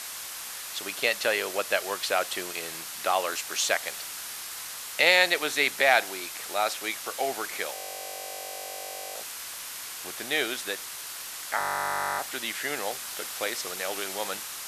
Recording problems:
thin; very; fading below 550 Hz
hiss; loud; throughout; 8 dB below the speech
audio freezing; at 8 s for 1.5 s and at 12 s for 0.5 s

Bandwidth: 14 kHz